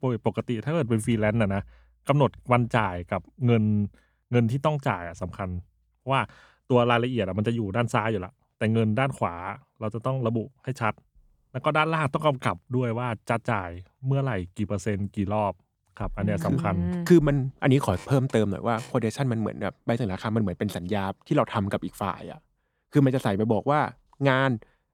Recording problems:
none

